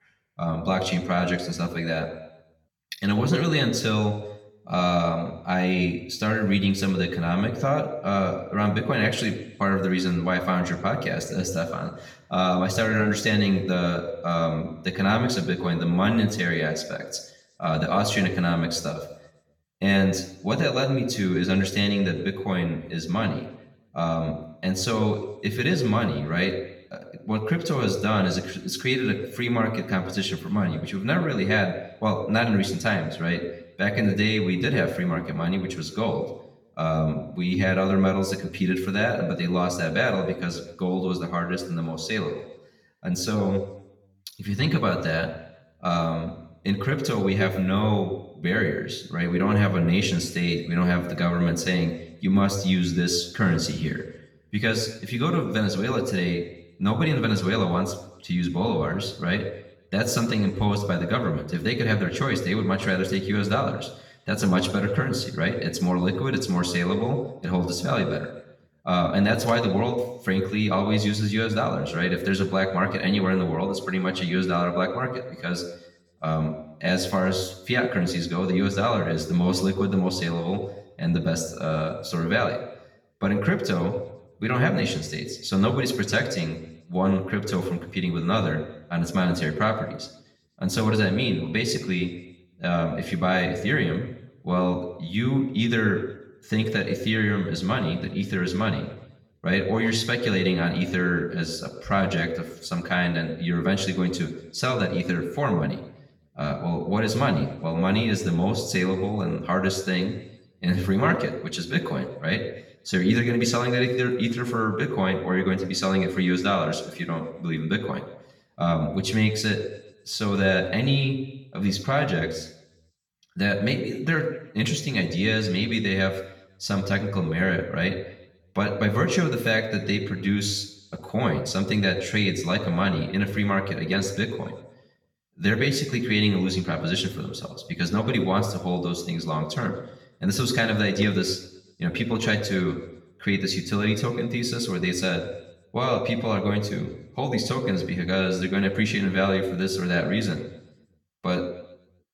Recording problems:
room echo; slight; dies away in 0.7 s
off-mic speech; somewhat distant

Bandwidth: 17 kHz